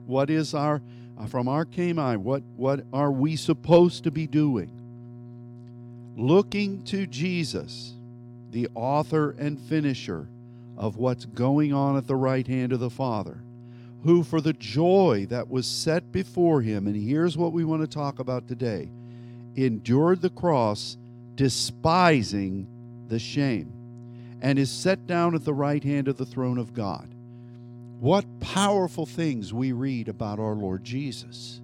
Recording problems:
electrical hum; faint; throughout; 60 Hz, 25 dB below the speech

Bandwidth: 16.5 kHz